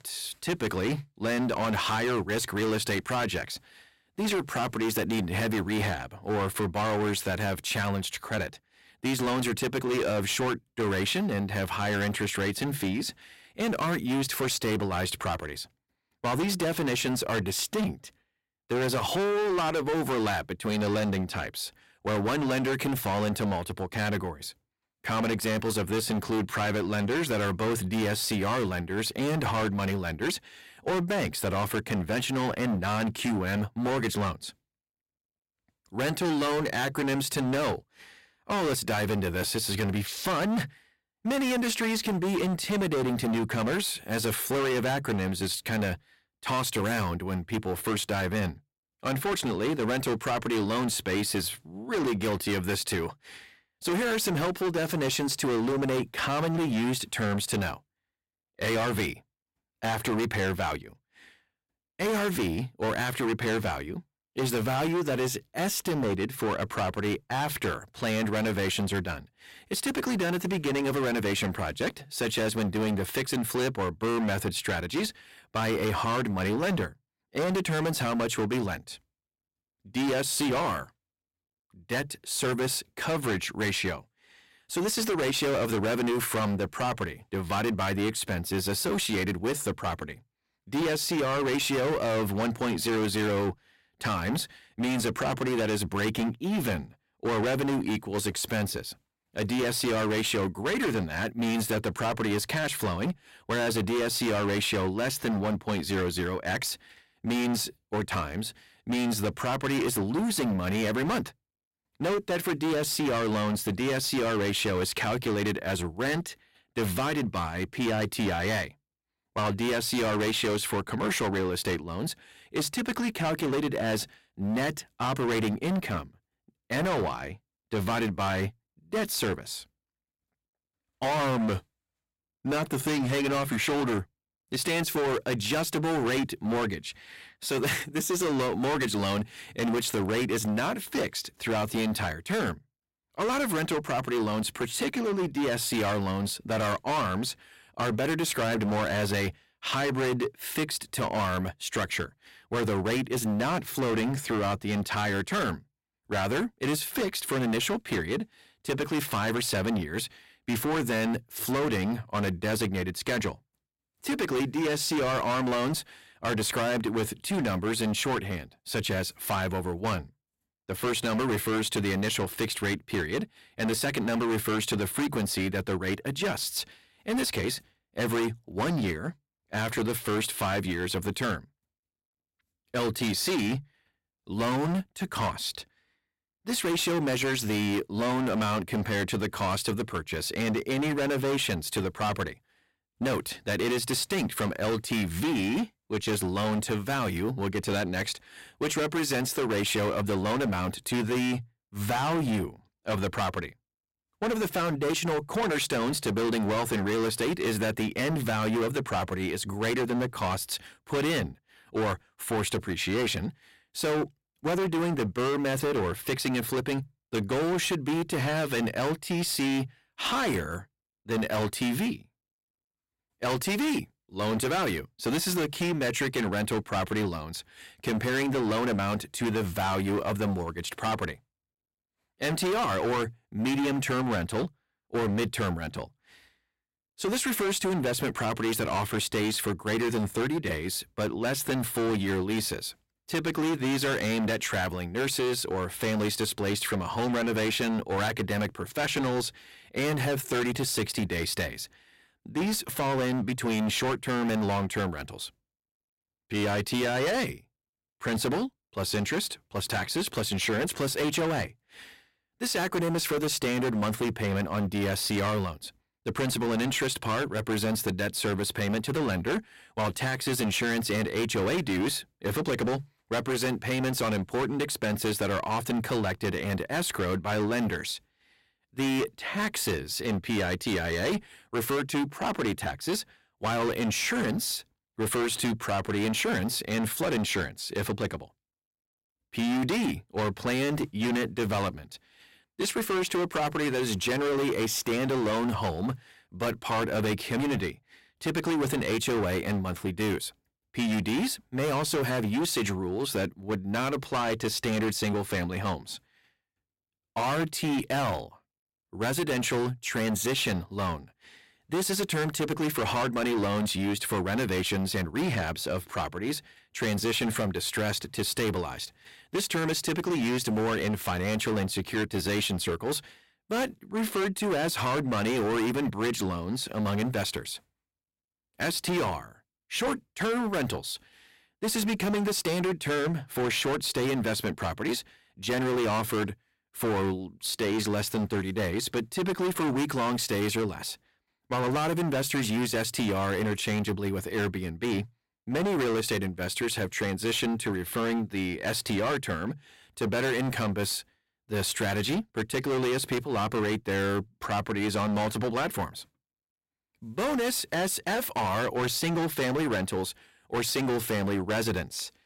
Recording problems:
distortion; heavy; 22% of the sound clipped

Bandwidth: 16 kHz